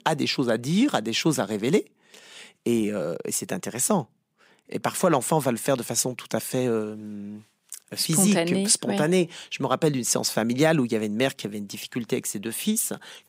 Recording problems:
none

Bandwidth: 15.5 kHz